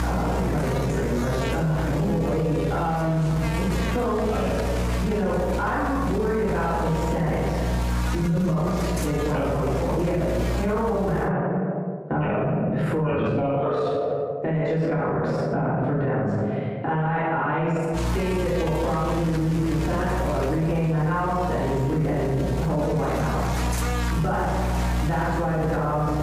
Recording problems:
room echo; strong; dies away in 1.1 s
off-mic speech; far
muffled; very; fading above 3 kHz
squashed, flat; somewhat
electrical hum; loud; until 11 s and from 18 s on; 60 Hz, 7 dB below the speech

